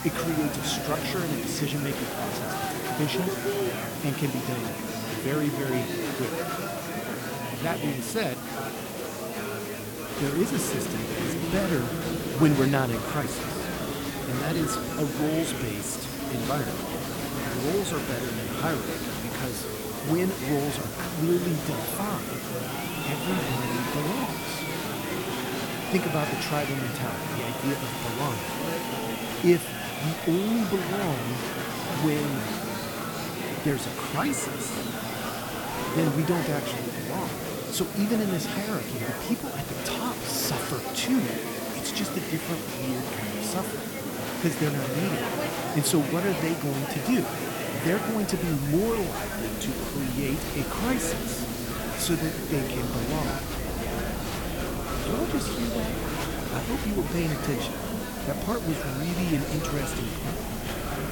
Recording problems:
murmuring crowd; loud; throughout; 2 dB below the speech
hiss; loud; throughout; 8 dB below the speech

